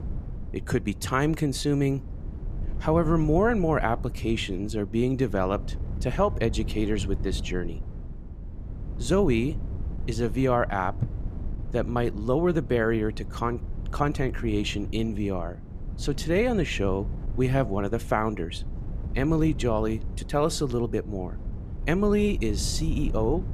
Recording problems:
wind noise on the microphone; occasional gusts; 20 dB below the speech

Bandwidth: 14.5 kHz